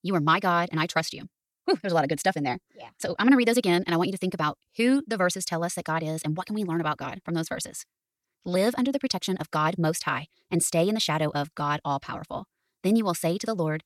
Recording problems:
wrong speed, natural pitch; too fast; 1.7 times normal speed

